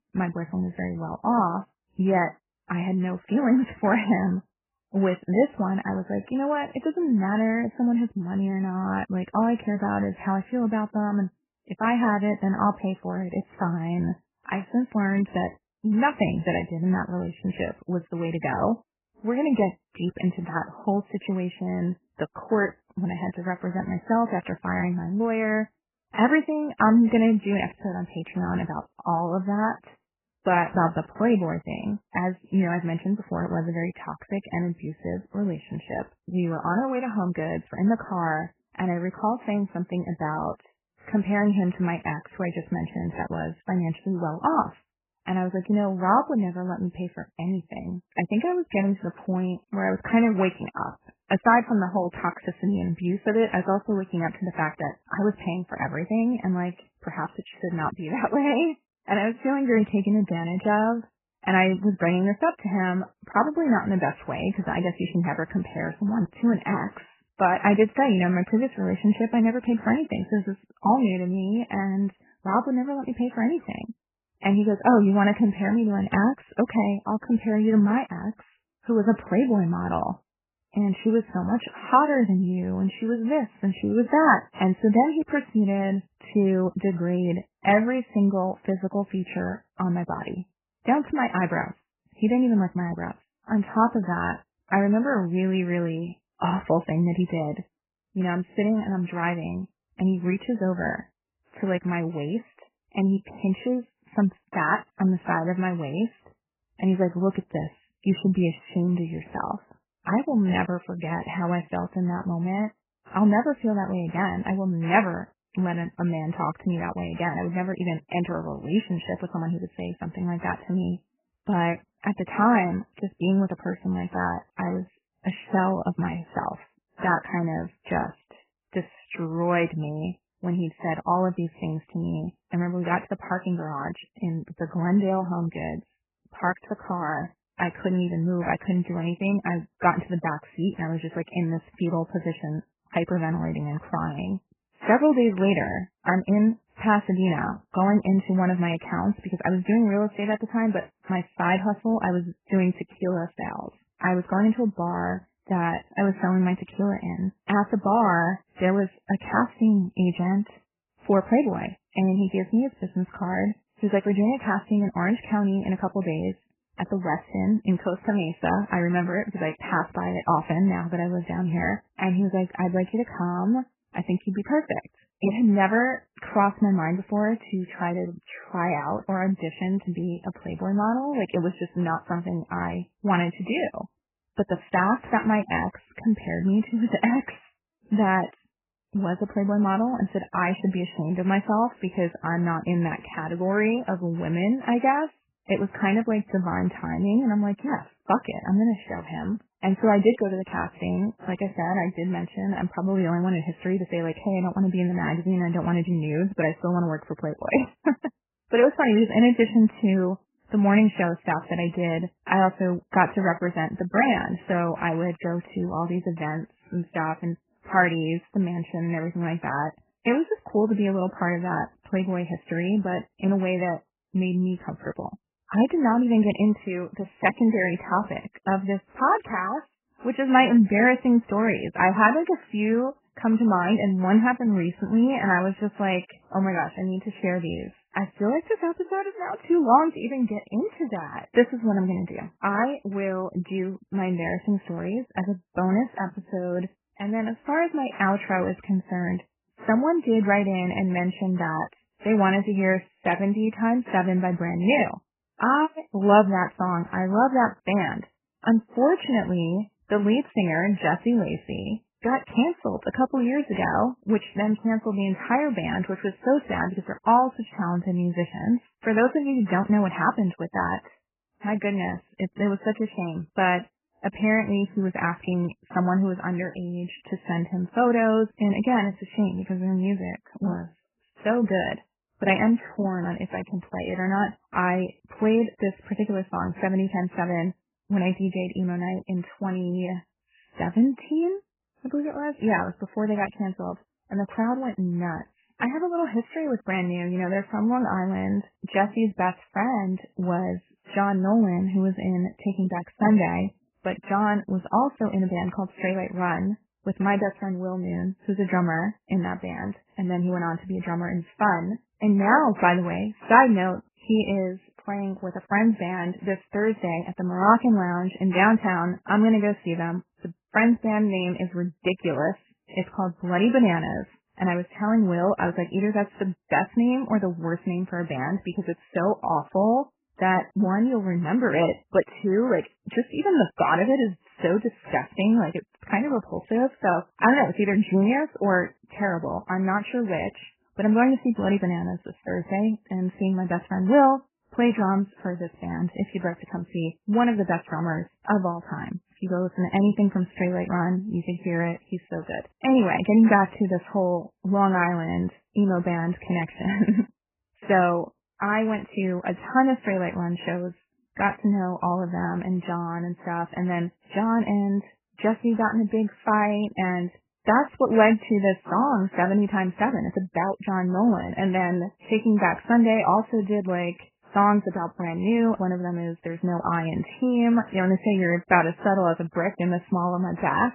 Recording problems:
garbled, watery; badly; nothing above 3 kHz

